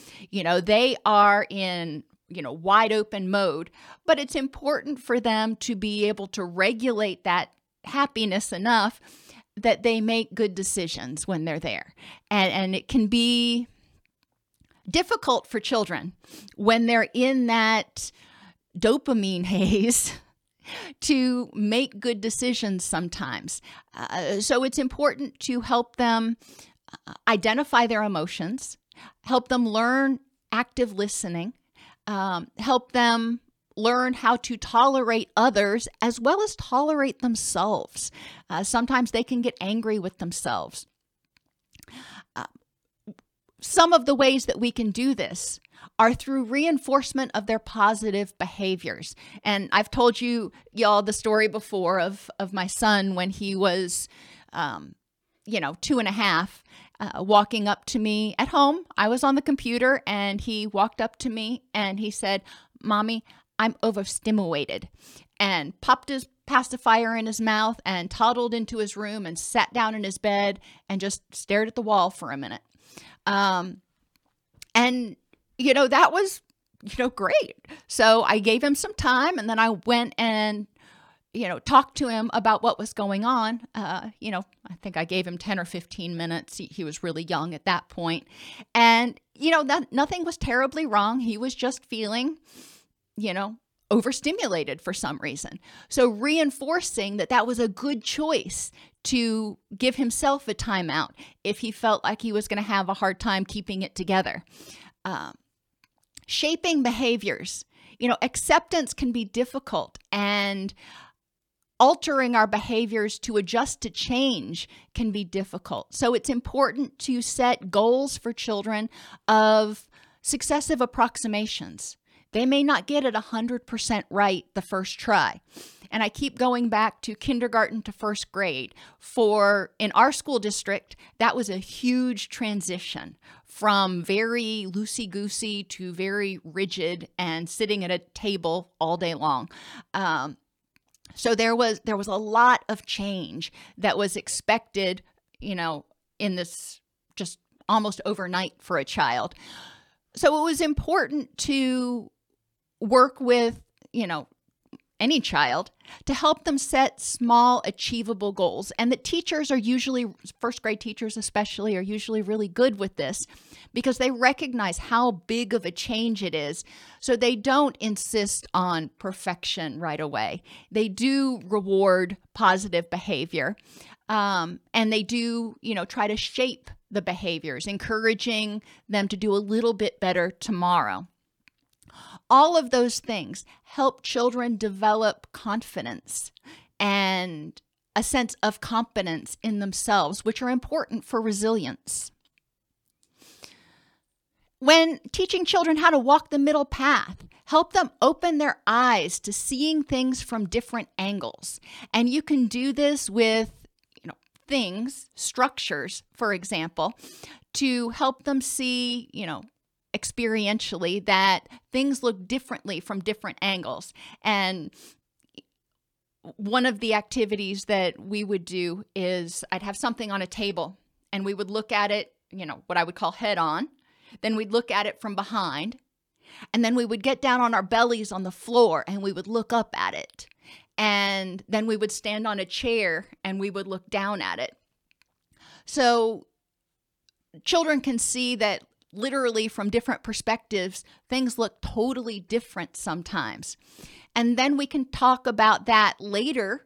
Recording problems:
none

